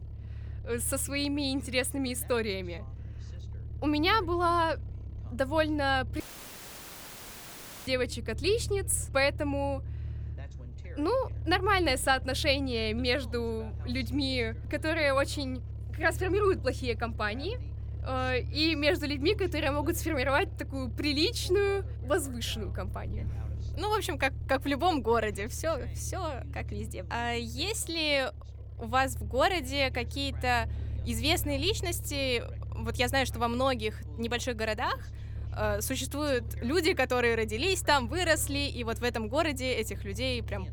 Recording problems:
voice in the background; faint; throughout; 25 dB below the speech
low rumble; faint; throughout; 25 dB below the speech
audio cutting out; filled with static; at 6 s for 1.5 s

